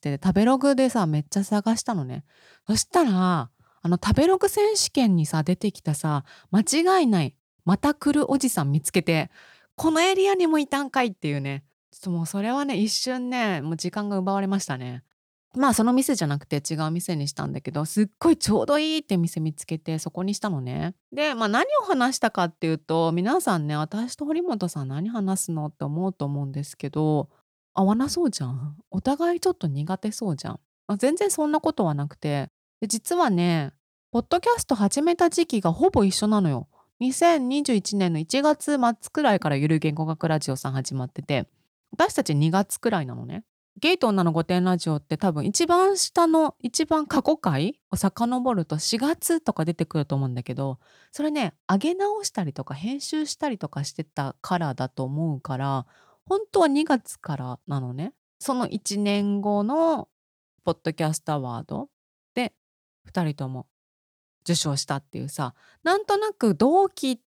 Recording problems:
none

